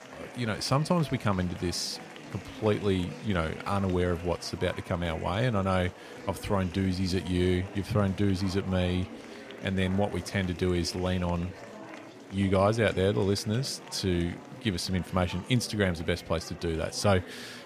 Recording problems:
murmuring crowd; noticeable; throughout; 15 dB below the speech

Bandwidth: 15 kHz